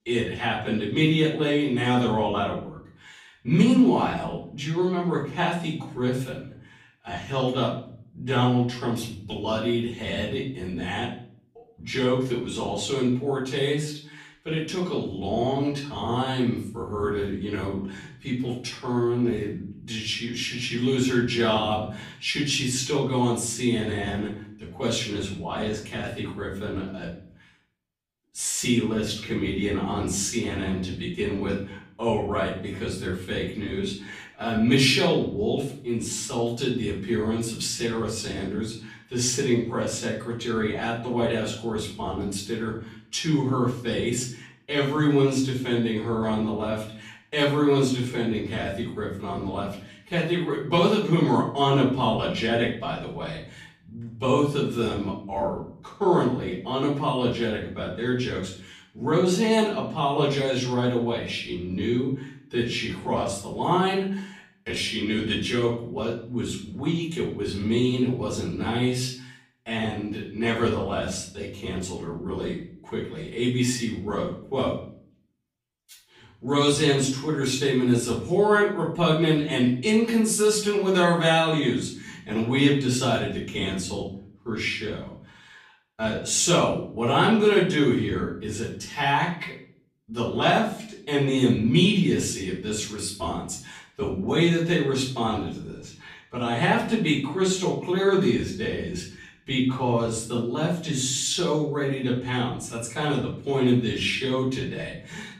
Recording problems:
off-mic speech; far
wrong speed, natural pitch; too slow; 0.7 times normal speed
room echo; noticeable; dies away in 0.5 s

